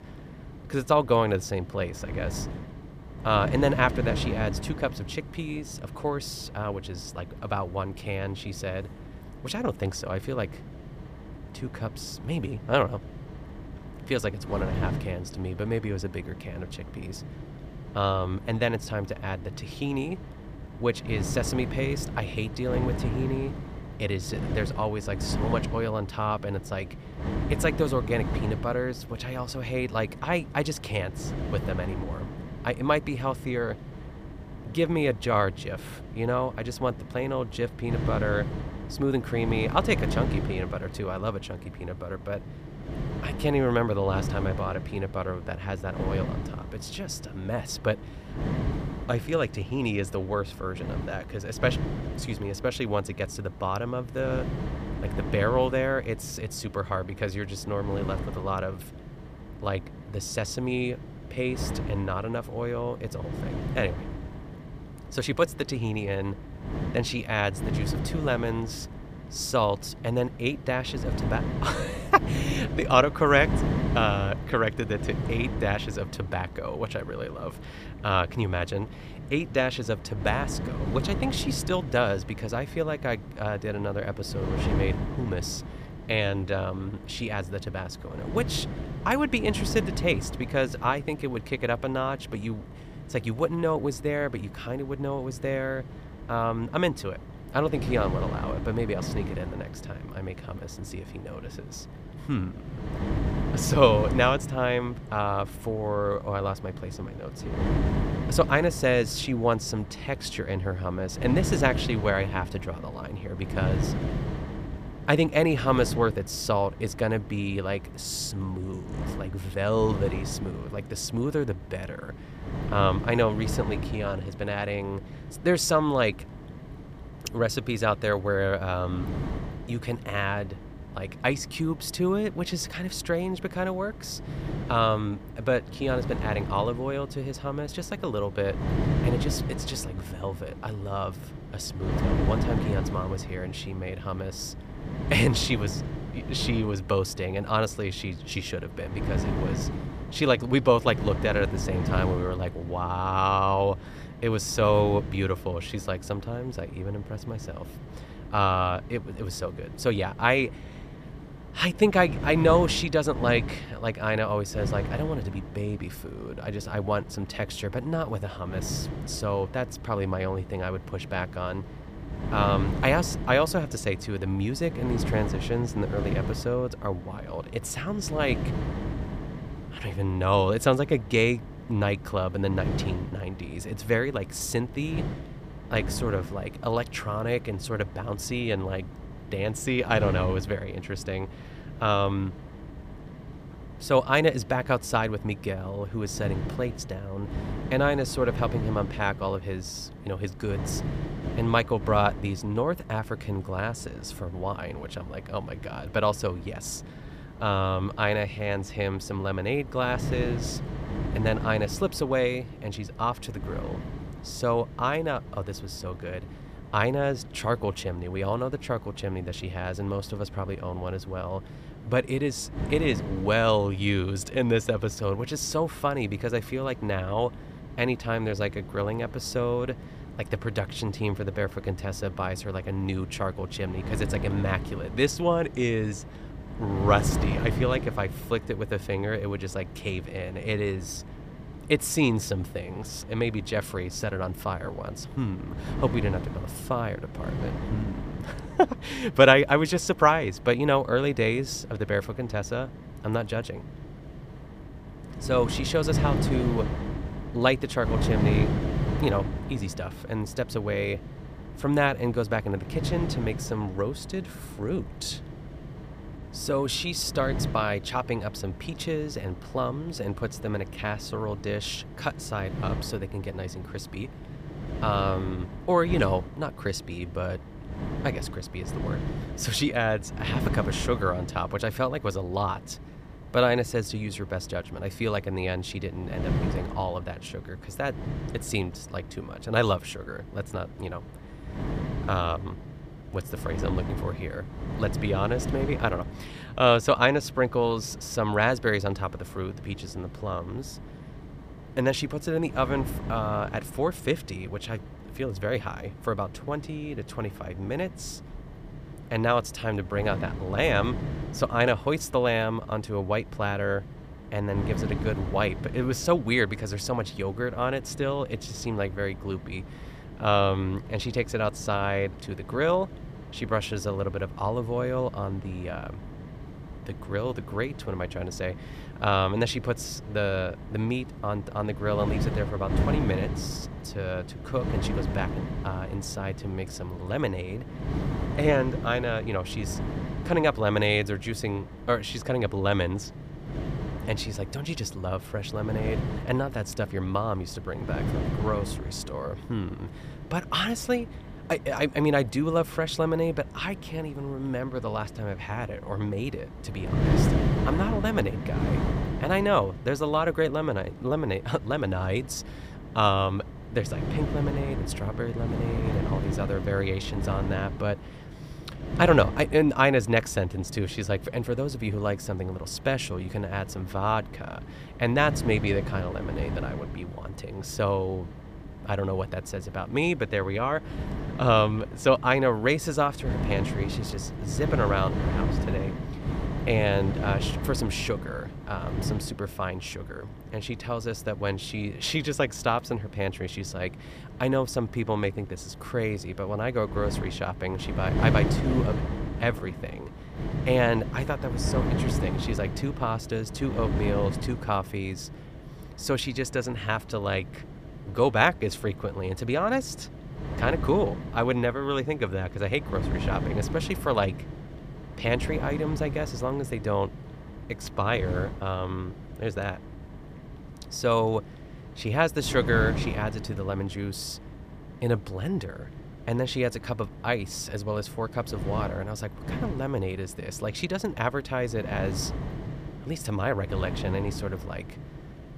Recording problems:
wind noise on the microphone; occasional gusts; 15 dB below the speech

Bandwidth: 15 kHz